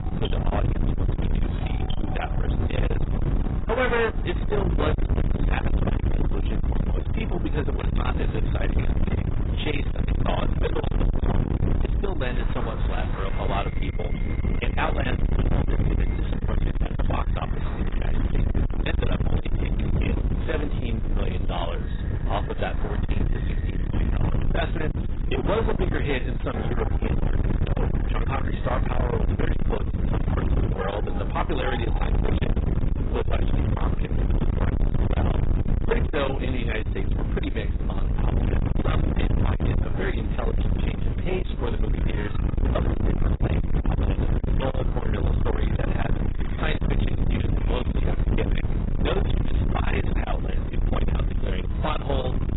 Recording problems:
distortion; heavy; 8 dB below the speech
garbled, watery; badly; nothing above 4 kHz
wind noise on the microphone; heavy; 4 dB below the speech
alarms or sirens; noticeable; throughout; 20 dB below the speech
animal sounds; noticeable; throughout; 15 dB below the speech

